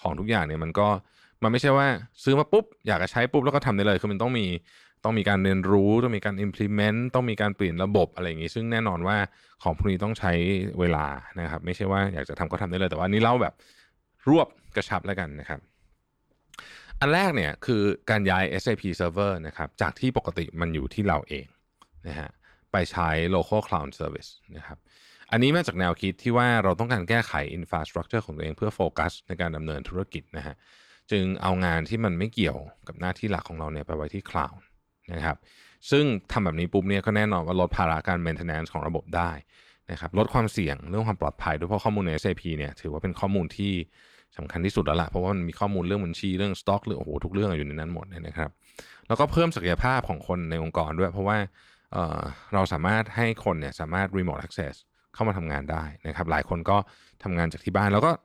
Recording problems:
none

